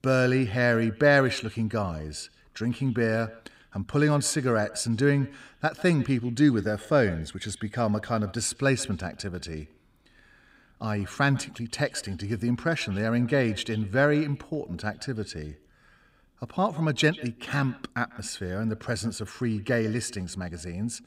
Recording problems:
echo of what is said; faint; throughout; 140 ms later, 20 dB below the speech

